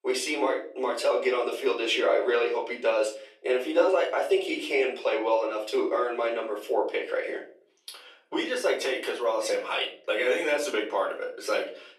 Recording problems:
off-mic speech; far
thin; very; fading below 400 Hz
room echo; slight; dies away in 0.4 s

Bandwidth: 13.5 kHz